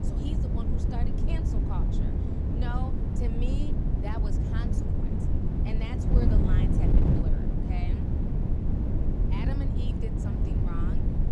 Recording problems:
wind noise on the microphone; heavy; 4 dB above the speech

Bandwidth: 14.5 kHz